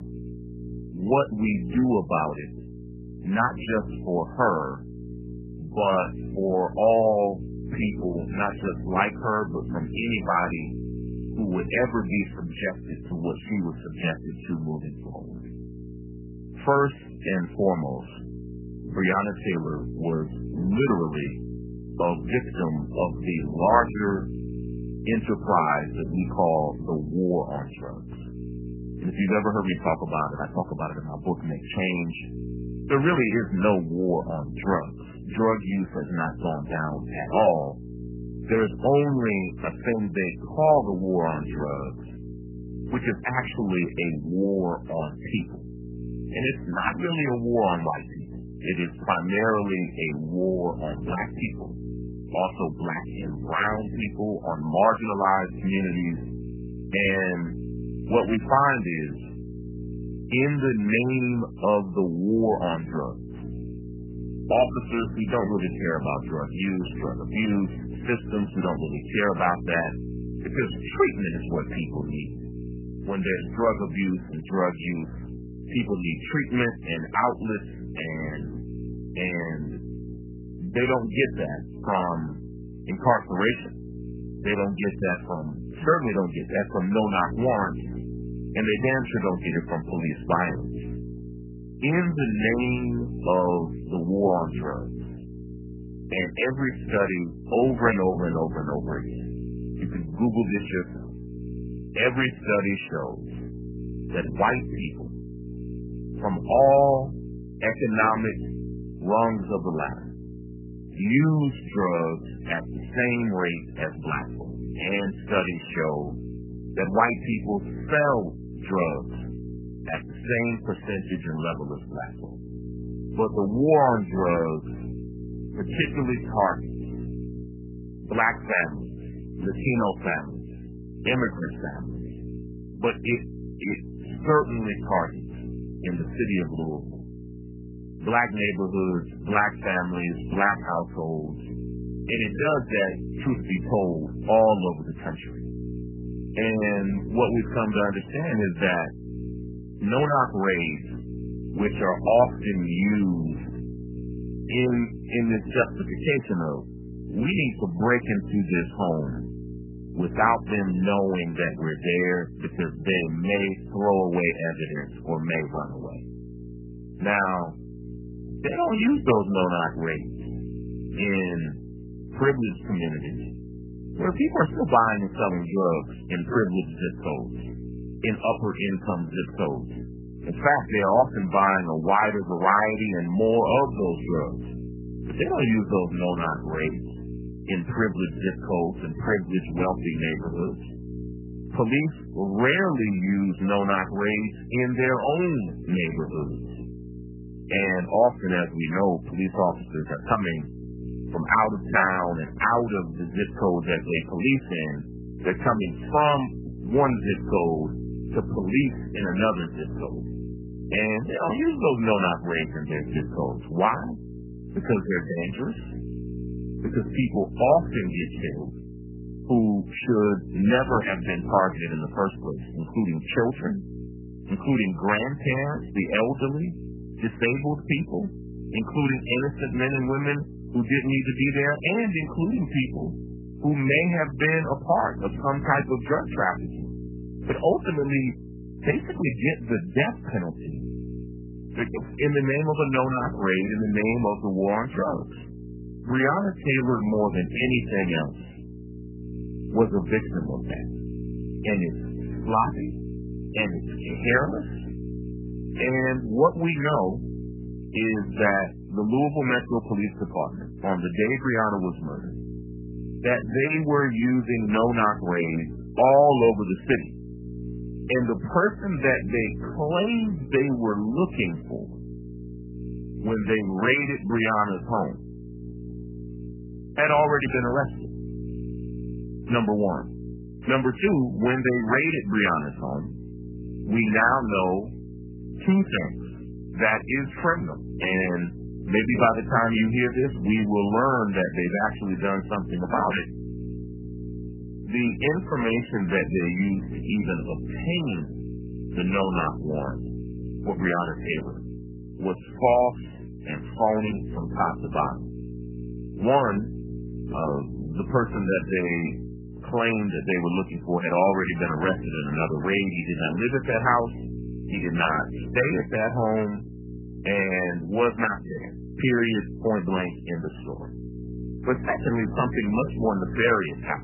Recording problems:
garbled, watery; badly; nothing above 3 kHz
electrical hum; noticeable; throughout; 60 Hz, 20 dB below the speech

